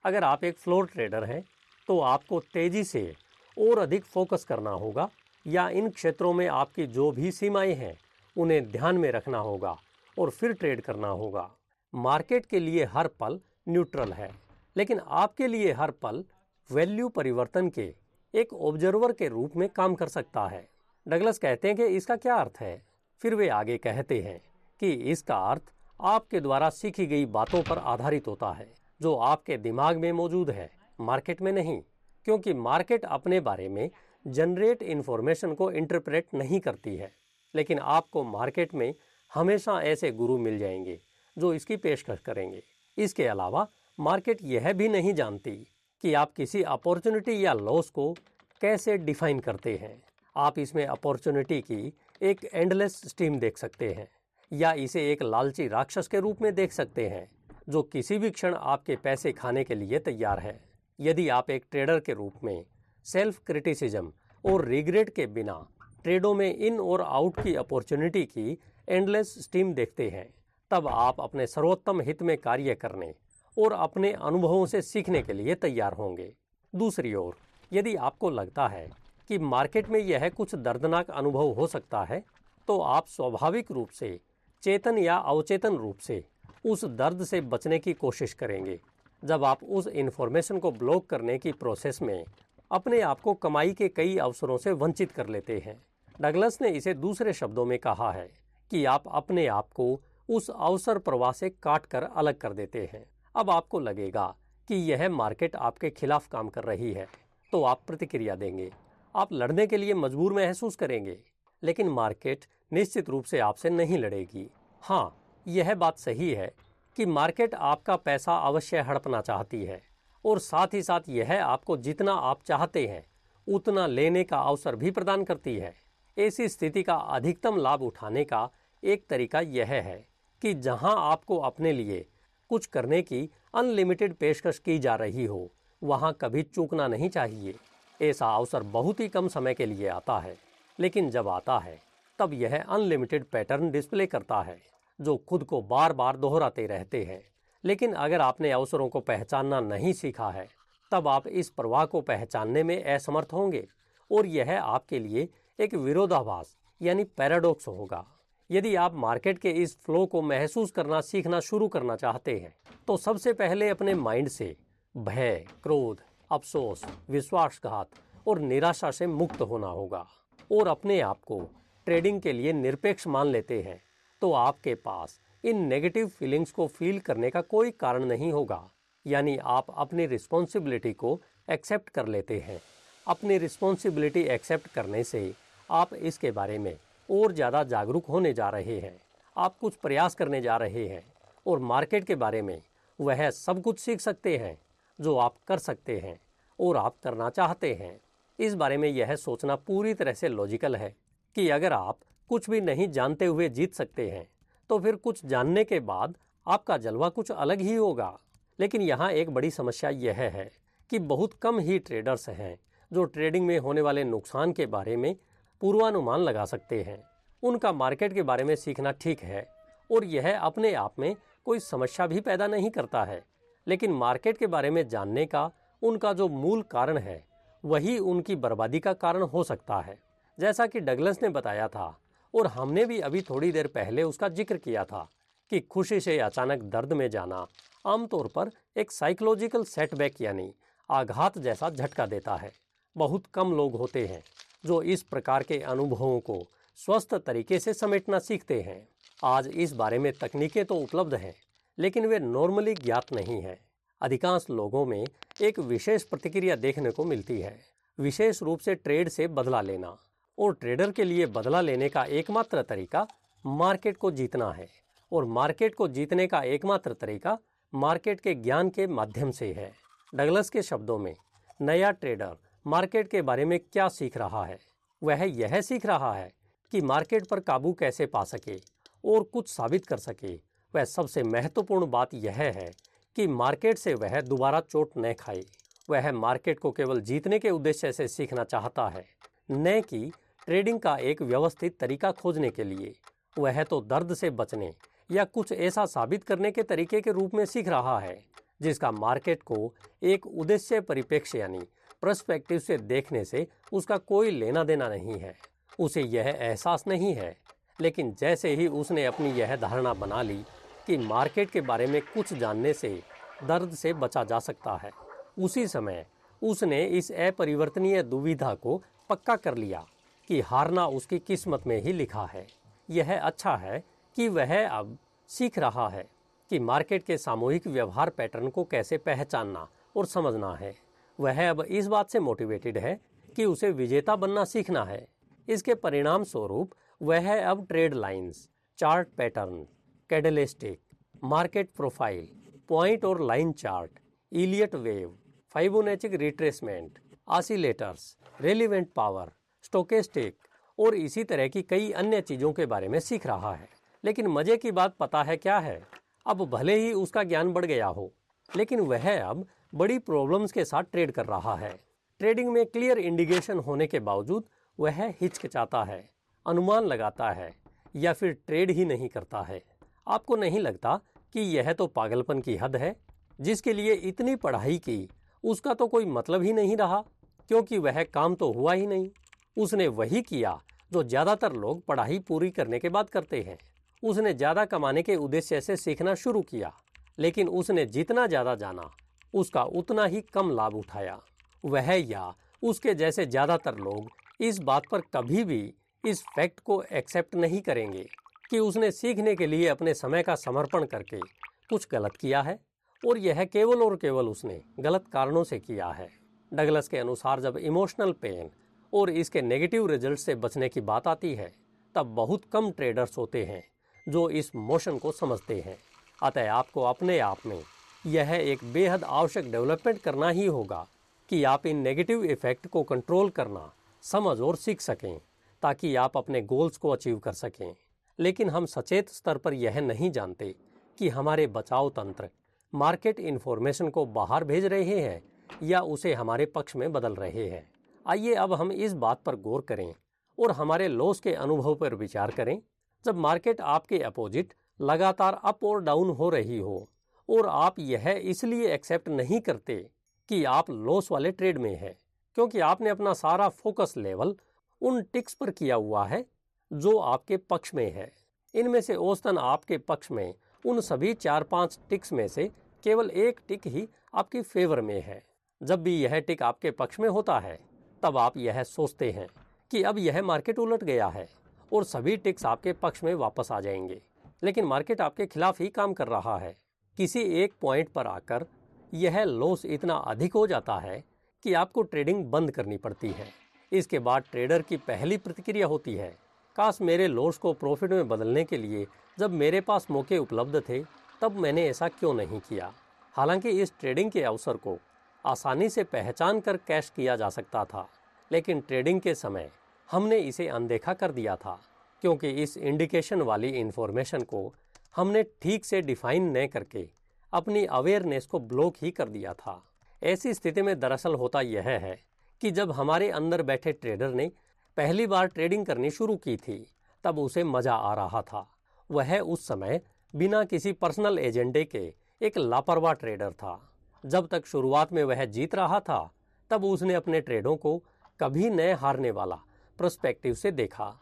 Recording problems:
household noises; faint; throughout; 30 dB below the speech

